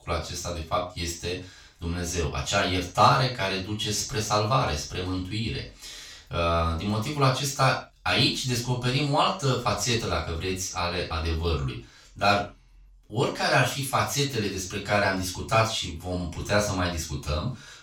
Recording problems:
off-mic speech; far
room echo; noticeable; dies away in 0.3 s

